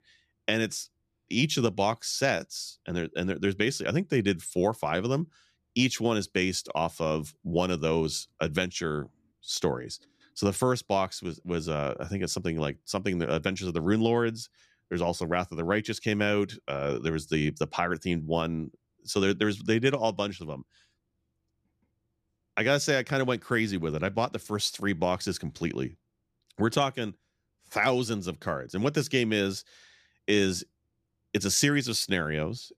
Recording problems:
none

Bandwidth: 14.5 kHz